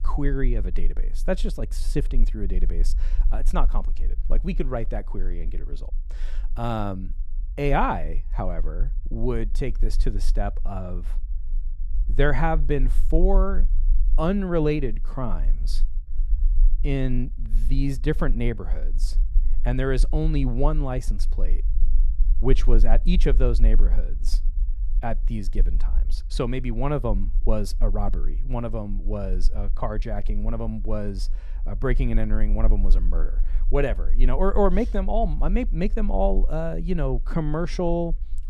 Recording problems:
low rumble; faint; throughout; 25 dB below the speech

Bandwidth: 13.5 kHz